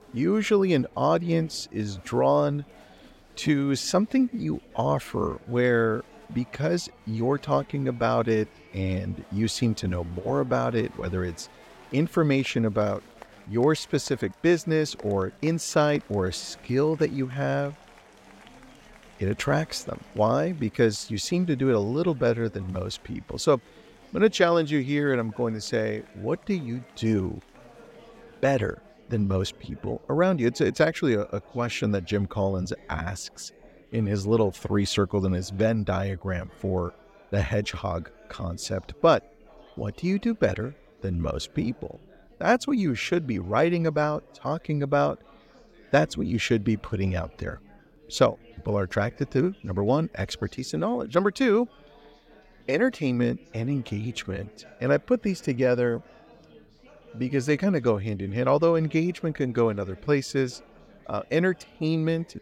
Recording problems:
chatter from many people; faint; throughout; 25 dB below the speech

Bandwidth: 16 kHz